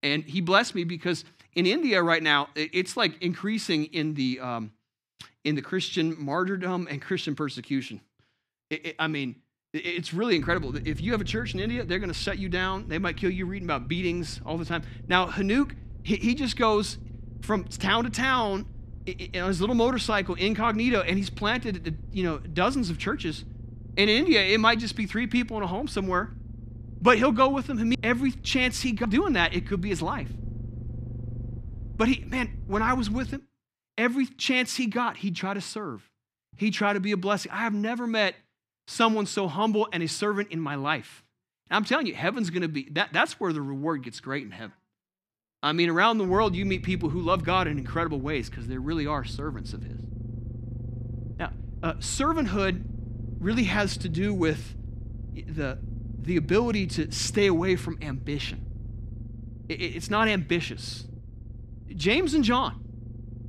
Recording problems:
low rumble; faint; from 10 to 33 s and from 46 s on; 25 dB below the speech

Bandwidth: 14.5 kHz